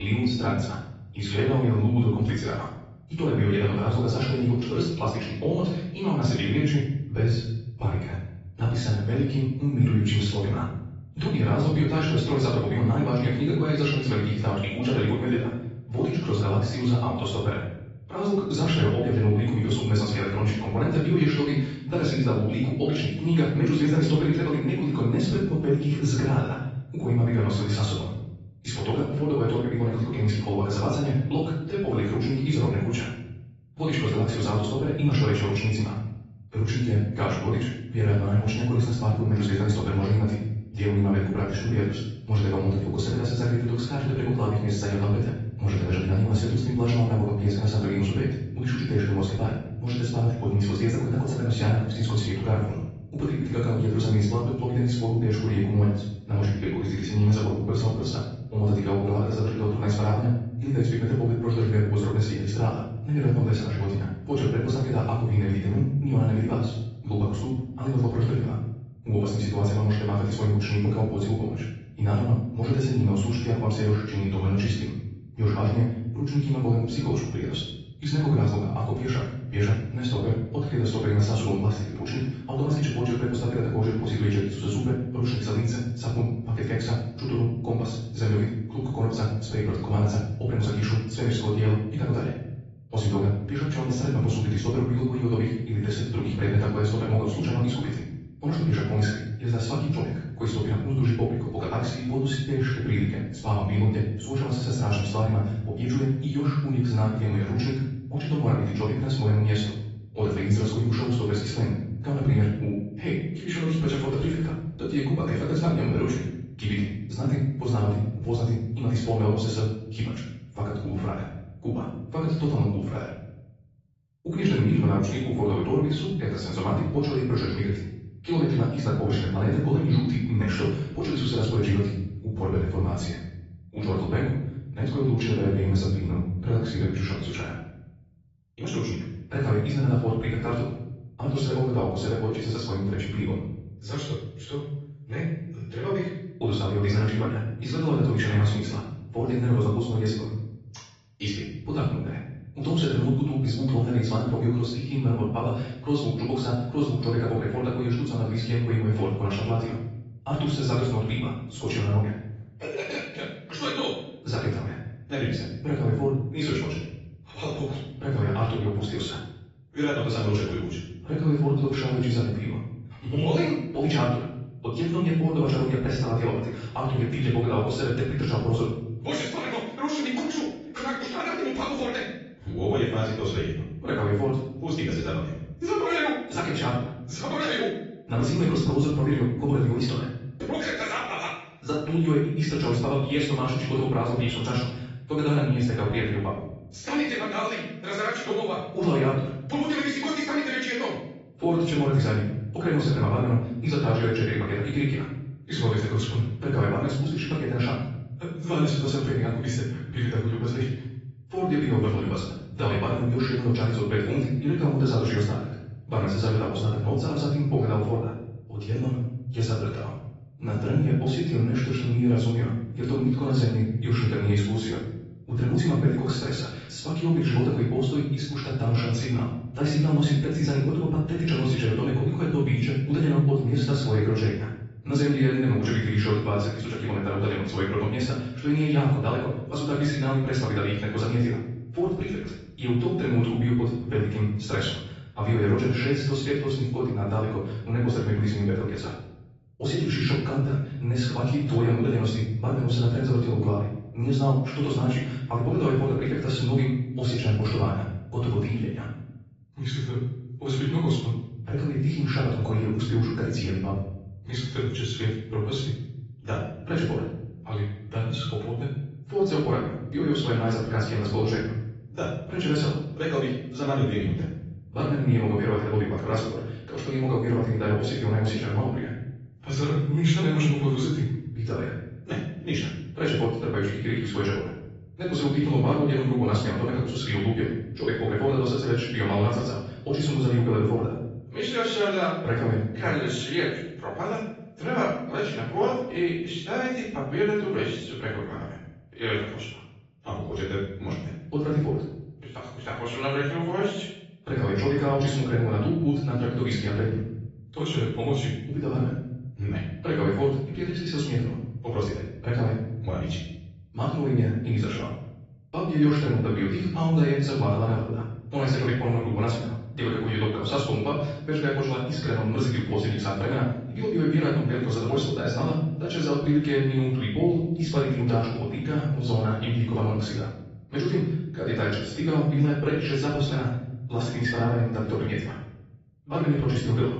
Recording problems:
off-mic speech; far
wrong speed, natural pitch; too fast; 1.5 times normal speed
room echo; noticeable; dies away in 0.9 s
high frequencies cut off; noticeable; nothing above 7.5 kHz
garbled, watery; slightly
abrupt cut into speech; at the start

